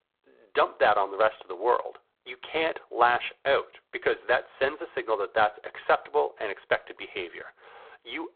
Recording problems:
phone-call audio; poor line

